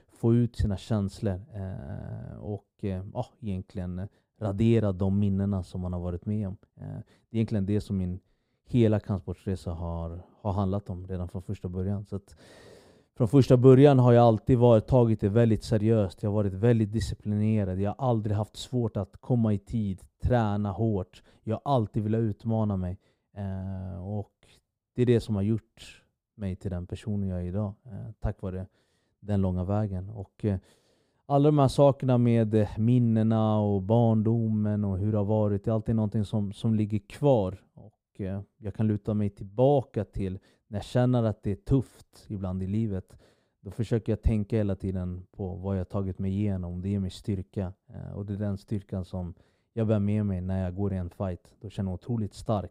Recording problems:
muffled; slightly; fading above 1.5 kHz

